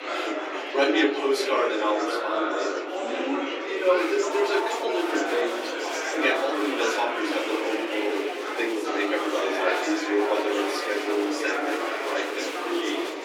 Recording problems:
off-mic speech; far
room echo; slight; dies away in 0.4 s
thin; very slightly; fading below 300 Hz
murmuring crowd; loud; throughout; 1 dB below the speech

